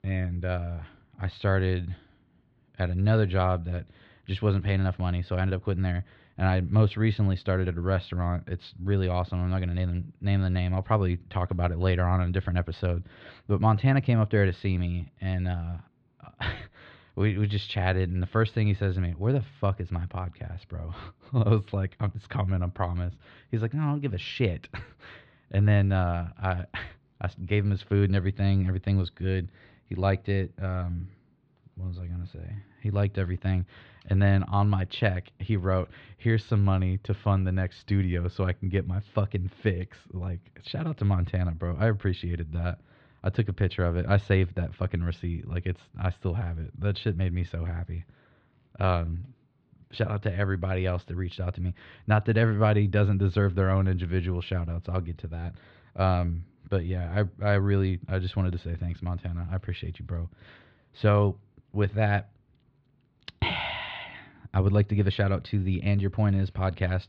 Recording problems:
muffled; slightly; fading above 4 kHz

